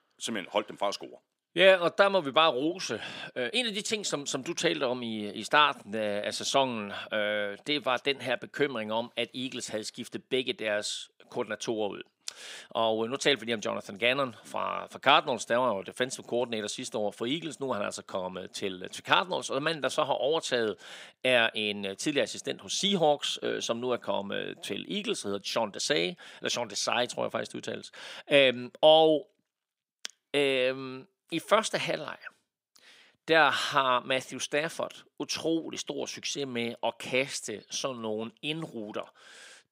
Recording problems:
thin; somewhat; fading below 300 Hz

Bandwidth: 15.5 kHz